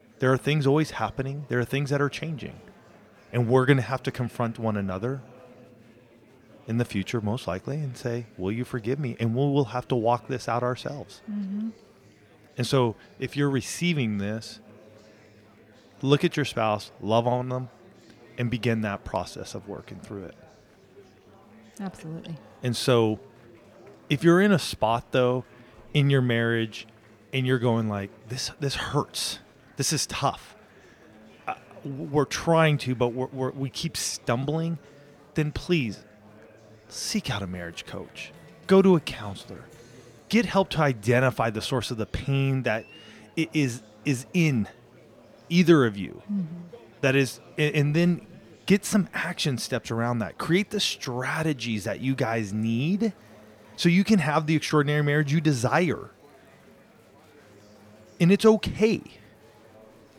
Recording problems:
murmuring crowd; faint; throughout; 25 dB below the speech

